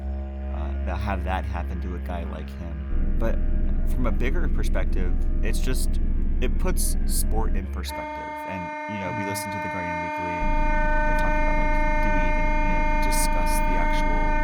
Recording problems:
background music; very loud; throughout; 4 dB above the speech
low rumble; loud; from 3 to 7.5 s and from 10 s on; 8 dB below the speech

